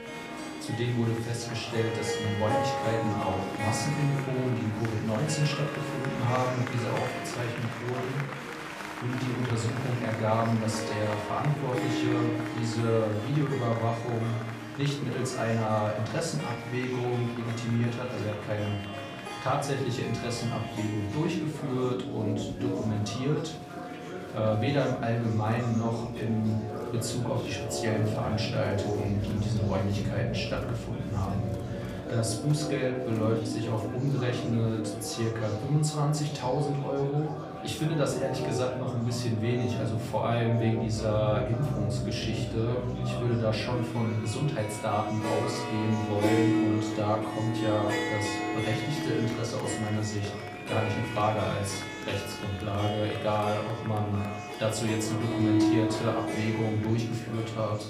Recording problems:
off-mic speech; far
room echo; slight; dies away in 0.5 s
background music; loud; throughout; 5 dB below the speech
murmuring crowd; noticeable; throughout; 10 dB below the speech

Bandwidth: 15 kHz